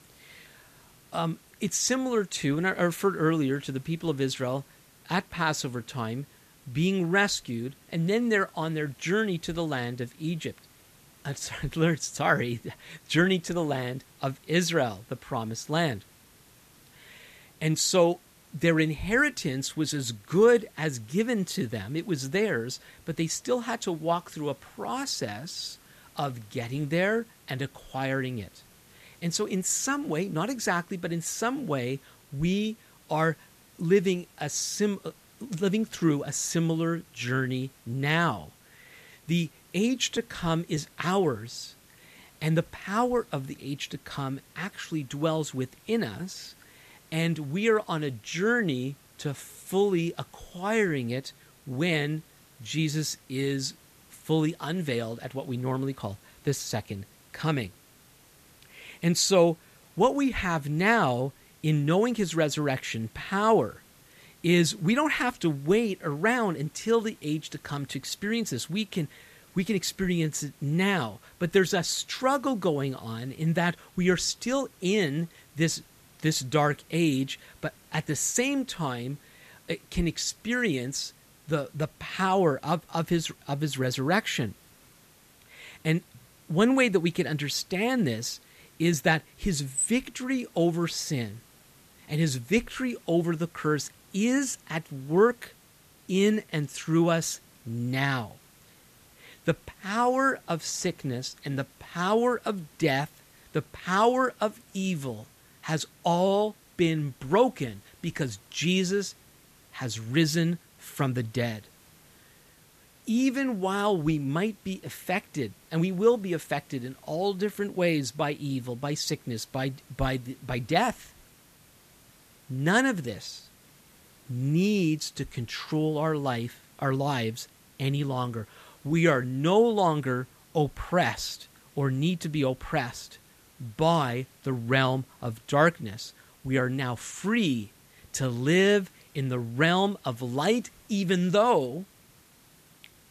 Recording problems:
hiss; faint; throughout; 25 dB below the speech

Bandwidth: 14.5 kHz